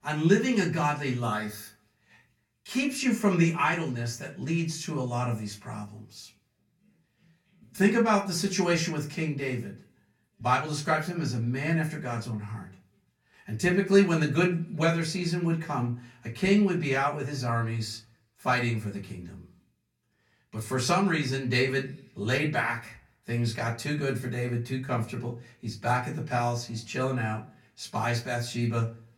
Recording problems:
off-mic speech; far
room echo; very slight; dies away in 0.3 s

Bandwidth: 17 kHz